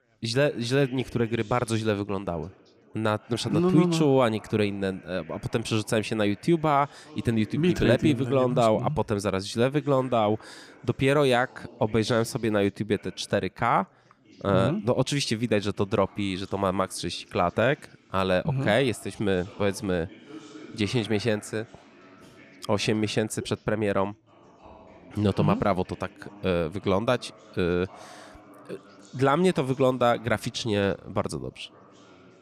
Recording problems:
background chatter; faint; throughout; 4 voices, 25 dB below the speech

